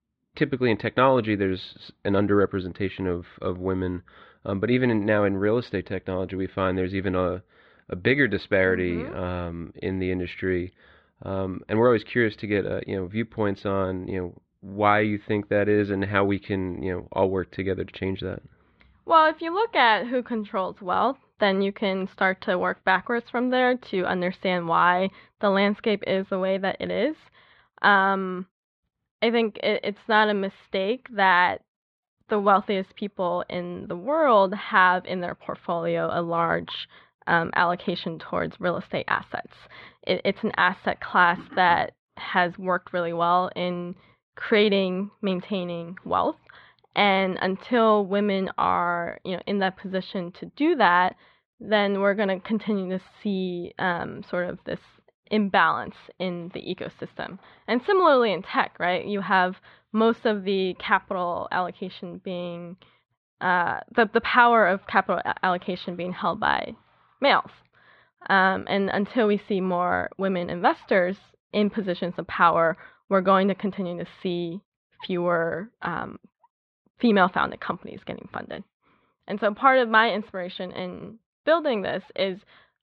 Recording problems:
muffled; slightly; fading above 3.5 kHz

